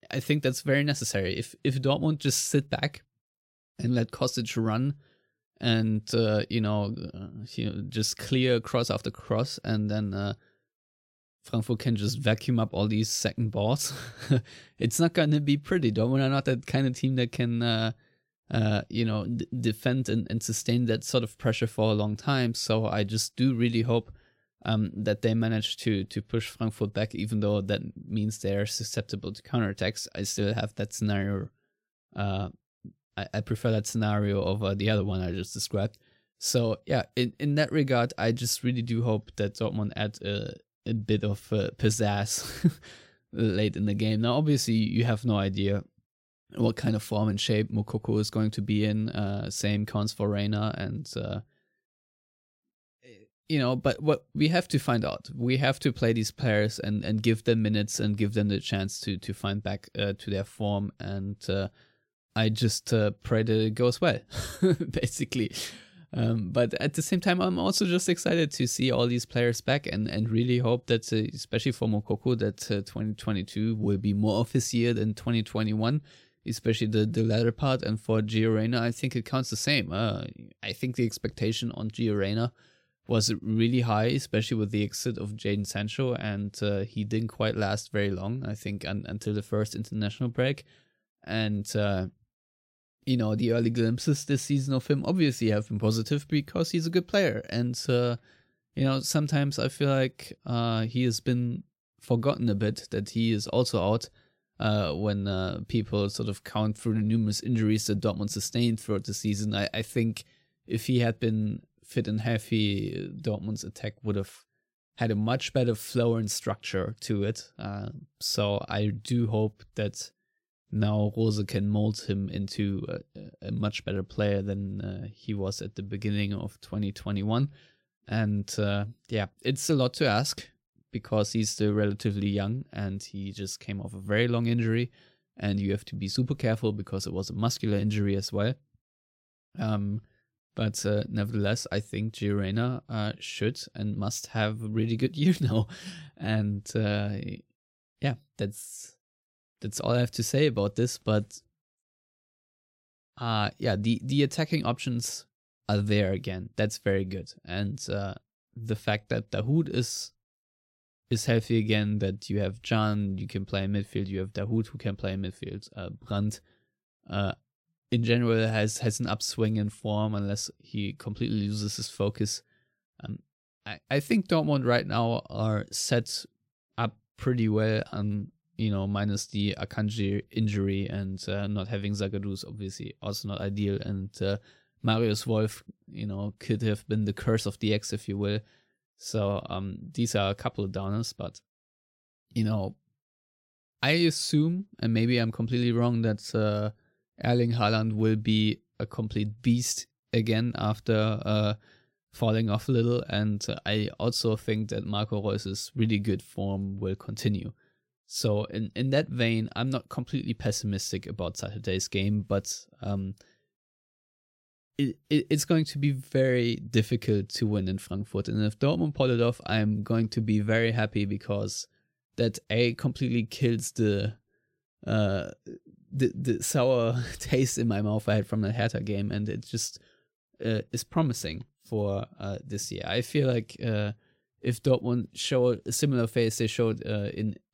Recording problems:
none

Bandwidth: 16 kHz